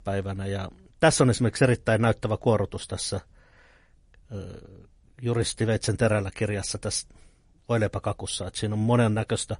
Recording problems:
garbled, watery; slightly; nothing above 10.5 kHz

